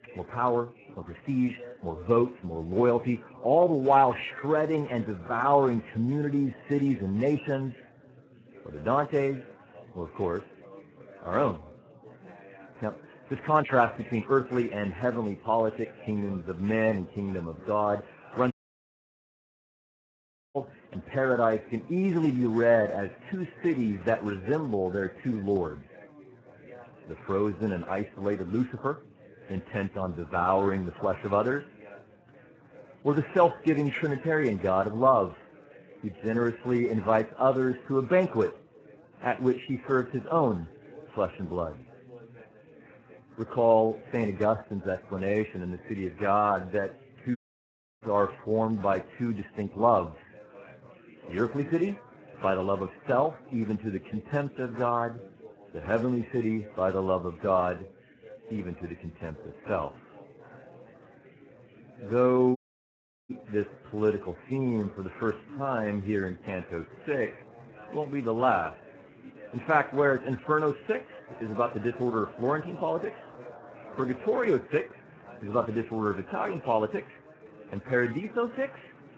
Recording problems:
garbled, watery; badly
chatter from many people; faint; throughout; 20 dB below the speech
audio cutting out; at 19 s for 2 s, at 47 s for 0.5 s and at 1:03 for 0.5 s

